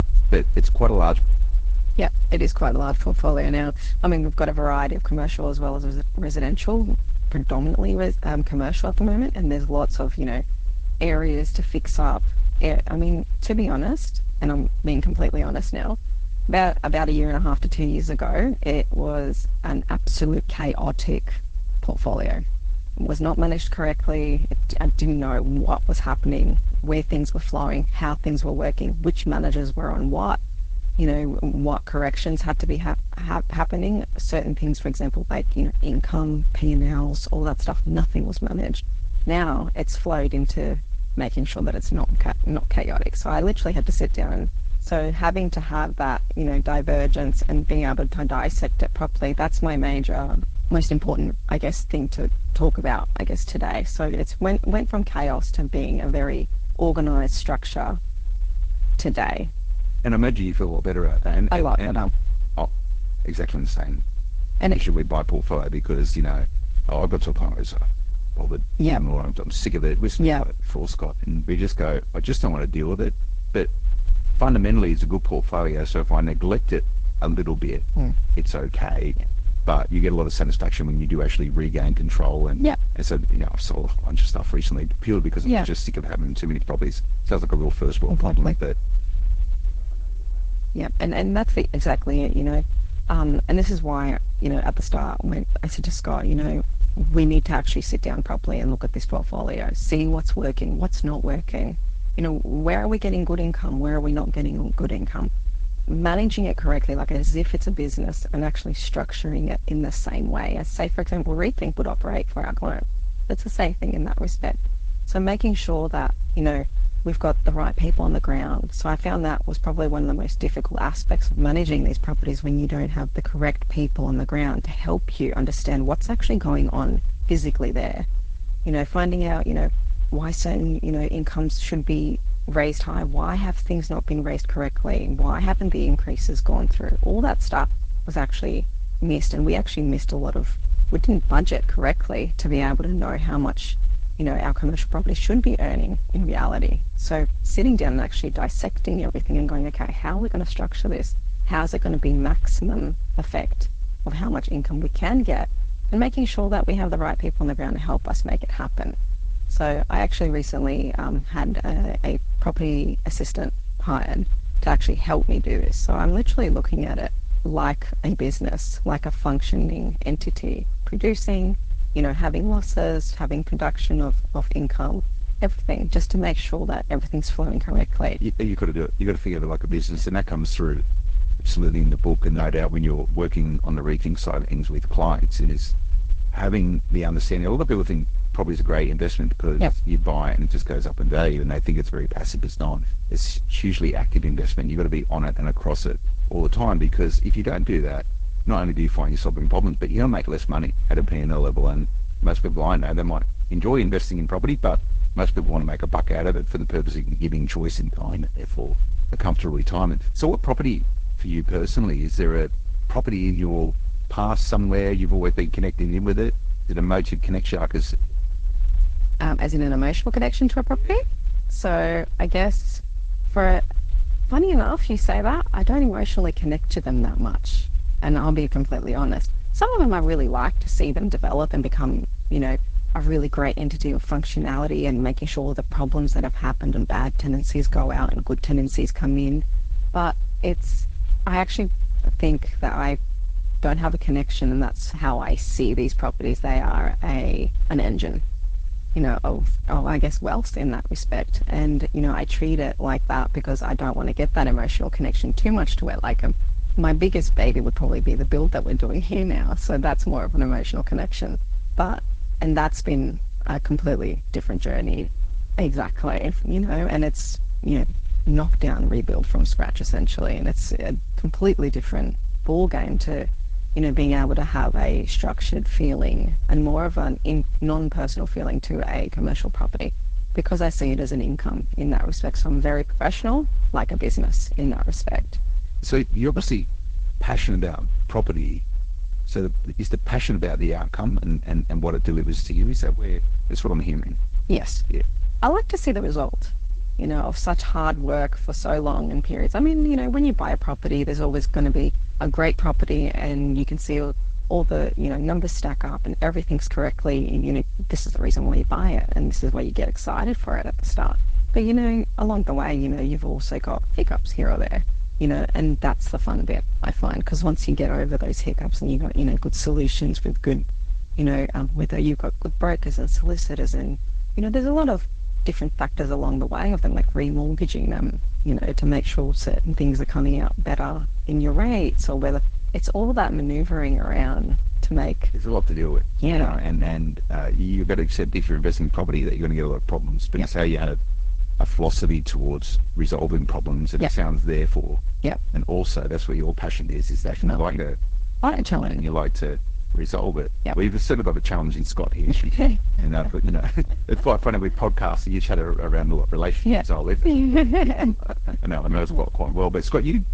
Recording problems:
garbled, watery; slightly
low rumble; faint; throughout; 20 dB below the speech

